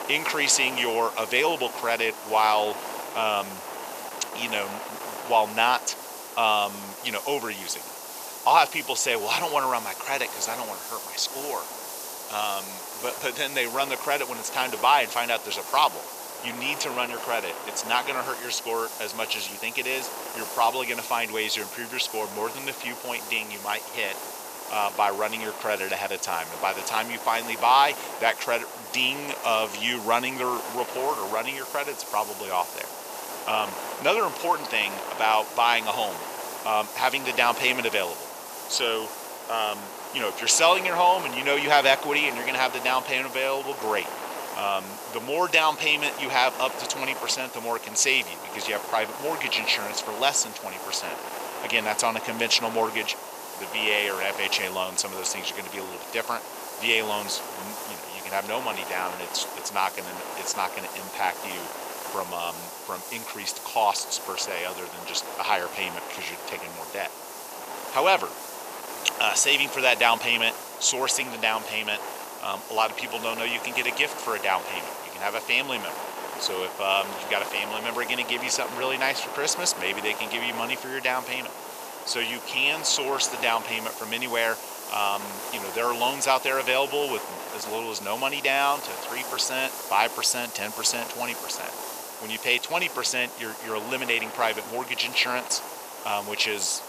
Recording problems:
thin; very; fading below 550 Hz
wind noise on the microphone; occasional gusts; 10 dB below the speech
hiss; noticeable; throughout; 15 dB below the speech

